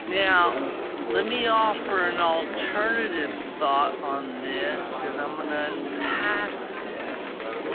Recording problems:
phone-call audio; poor line
wrong speed, natural pitch; too slow; 0.5 times normal speed
murmuring crowd; loud; throughout; 6 dB below the speech

